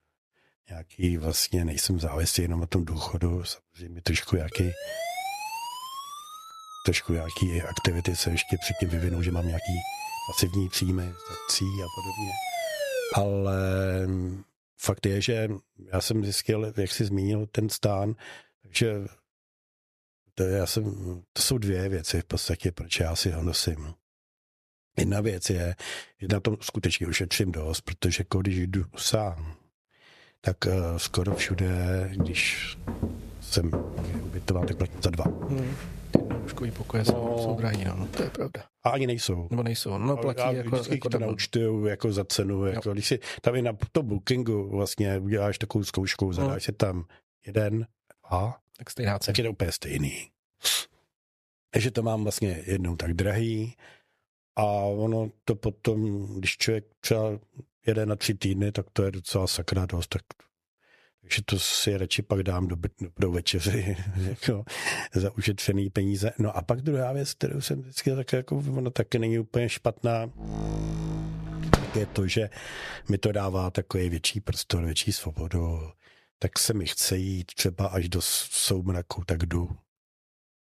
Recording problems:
squashed, flat; somewhat
uneven, jittery; strongly; from 1 to 47 s
siren; noticeable; from 4.5 to 13 s; peak 2 dB below the speech
footsteps; loud; from 31 to 38 s; peak 2 dB above the speech
door banging; loud; from 1:11 to 1:12; peak 3 dB above the speech

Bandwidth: 14 kHz